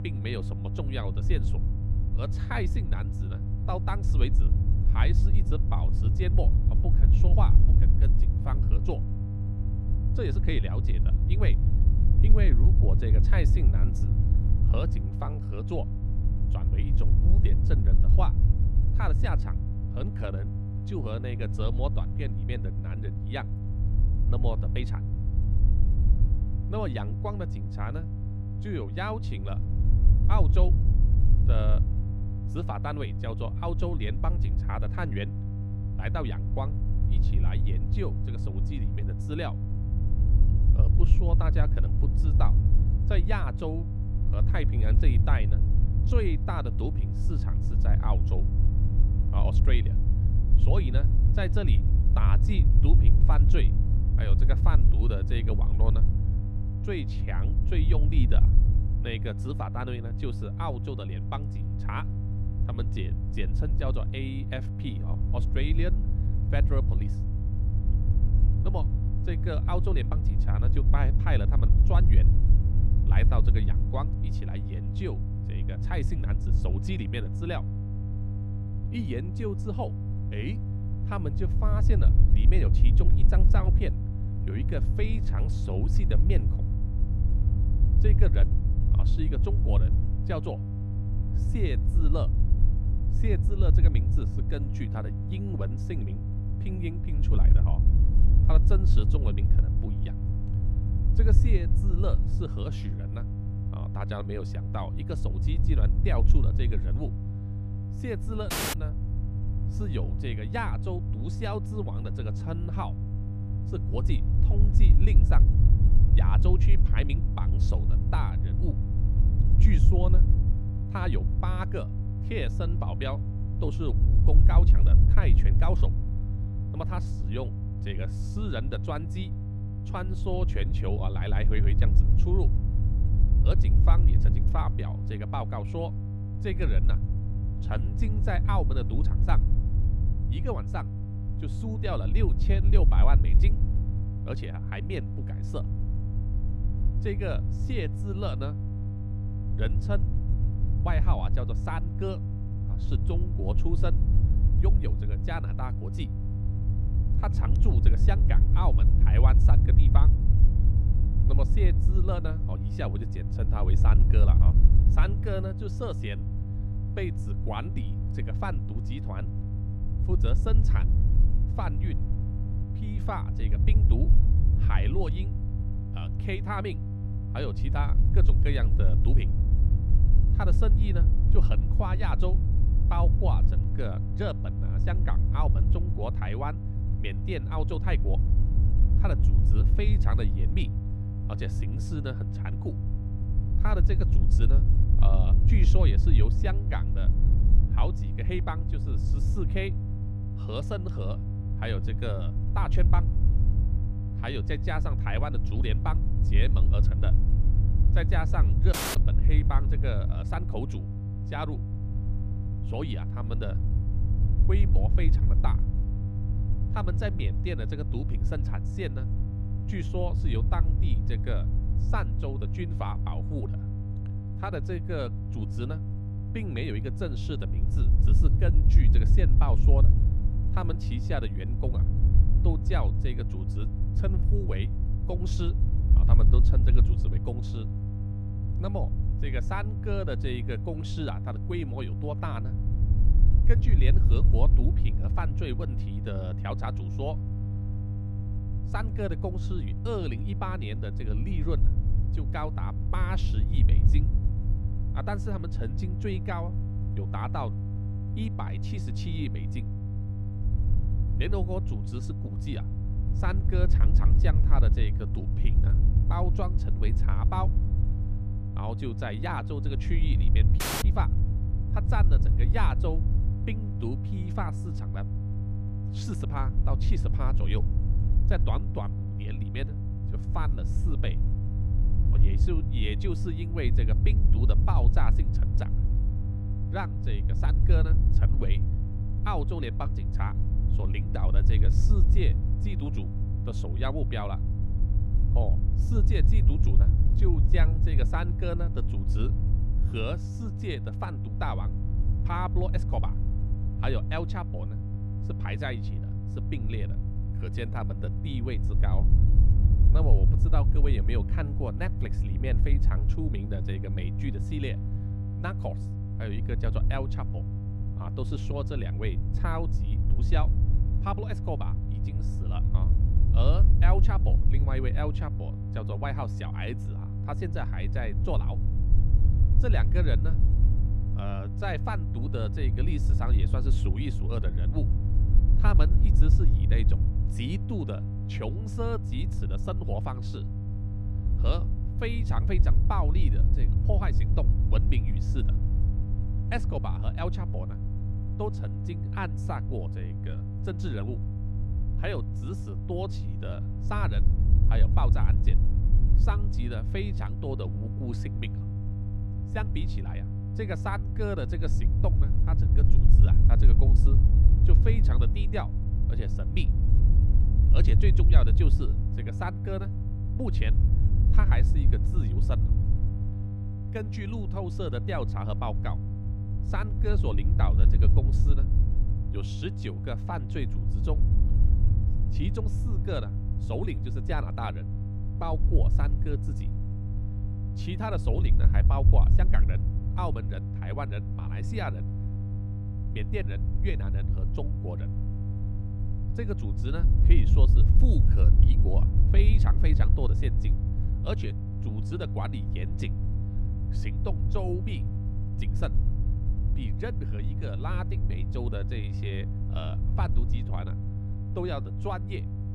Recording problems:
wind noise on the microphone; heavy; 8 dB below the speech
electrical hum; loud; throughout; 50 Hz, 7 dB below the speech
audio cutting out; at 1:49, at 3:29 and at 4:31

